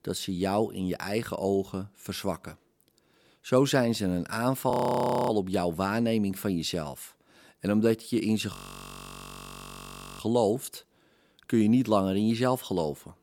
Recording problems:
audio freezing; at 4.5 s for 0.5 s and at 8.5 s for 1.5 s

